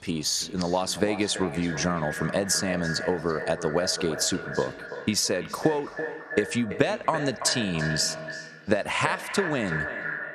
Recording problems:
echo of what is said; strong; throughout; 330 ms later, 8 dB below the speech
squashed, flat; somewhat

